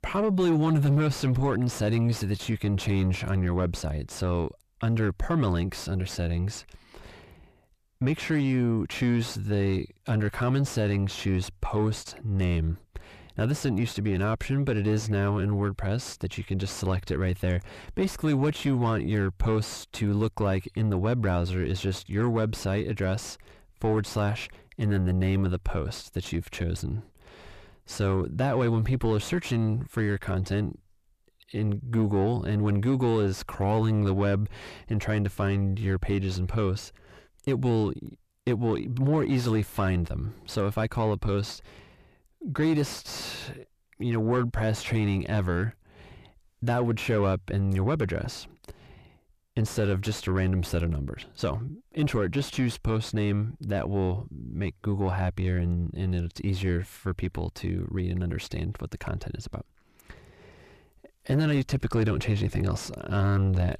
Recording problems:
distortion; slight; 9 dB below the speech

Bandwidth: 14.5 kHz